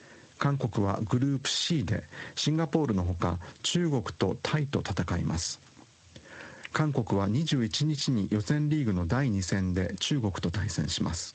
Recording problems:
squashed, flat; heavily
garbled, watery; slightly; nothing above 8 kHz

